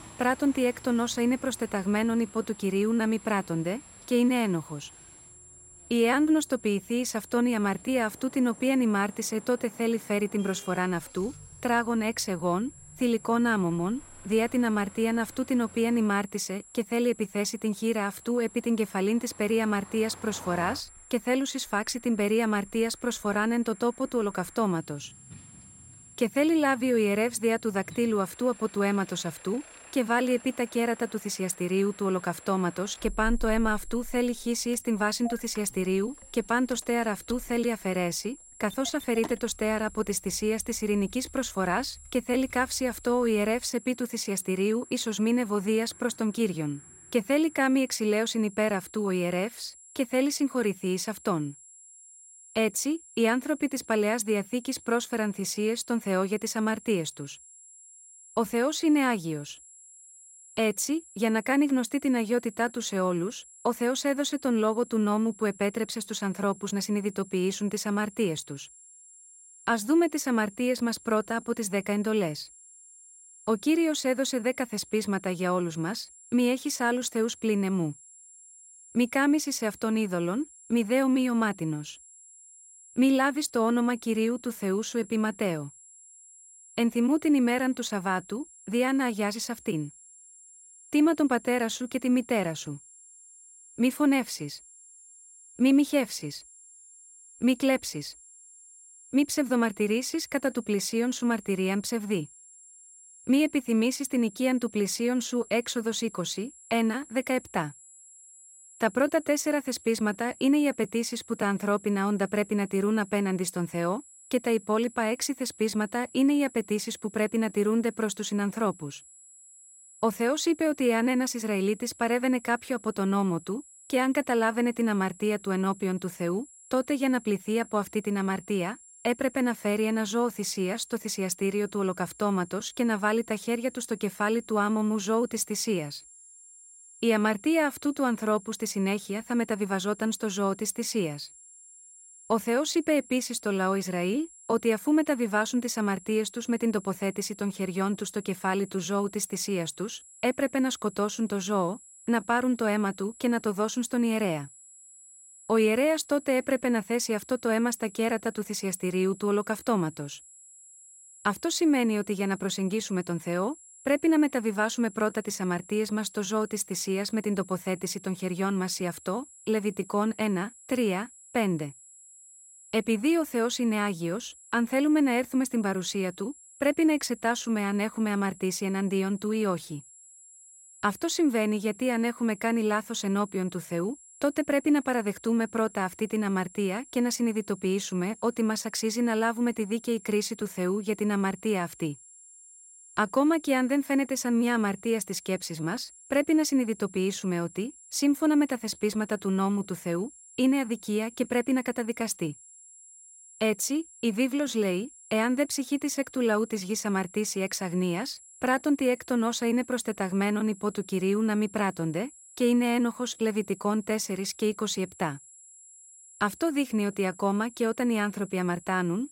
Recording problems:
high-pitched whine; faint; throughout; 7.5 kHz, 20 dB below the speech
traffic noise; faint; until 48 s; 25 dB below the speech

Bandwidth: 16 kHz